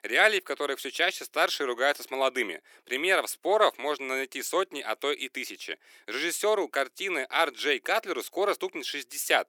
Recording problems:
thin; very; fading below 300 Hz

